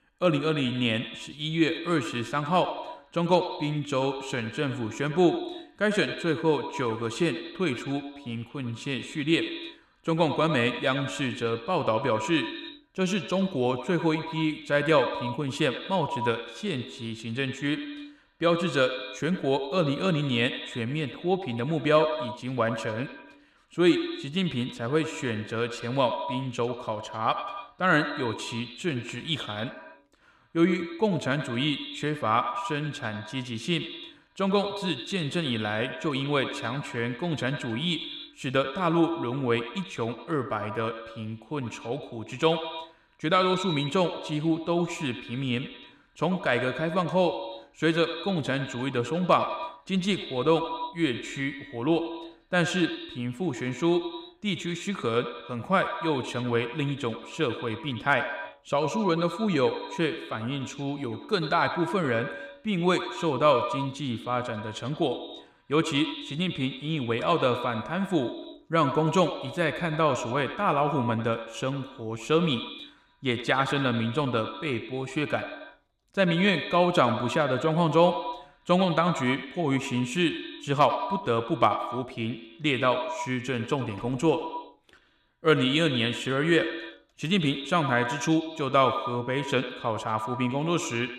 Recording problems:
echo of what is said; strong; throughout; 90 ms later, 9 dB below the speech

